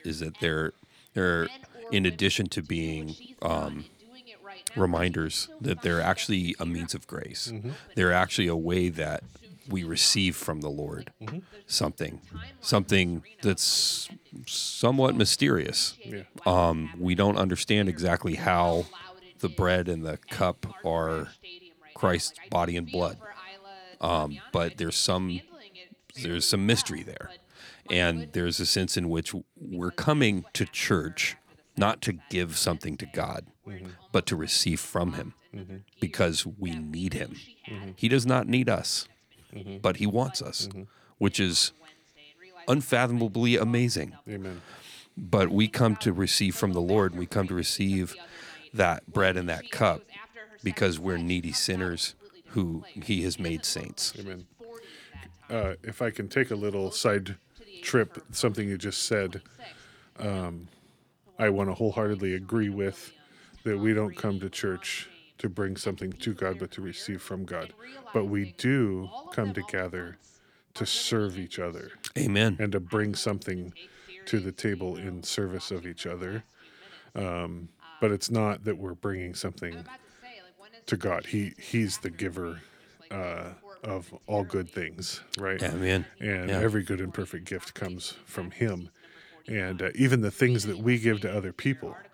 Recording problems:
voice in the background; faint; throughout; 20 dB below the speech

